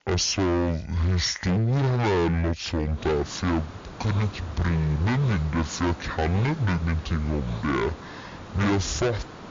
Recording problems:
distortion; heavy; 22% of the sound clipped
wrong speed and pitch; too slow and too low; 0.5 times normal speed
hiss; noticeable; from 3 s on; 15 dB below the speech

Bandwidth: 7 kHz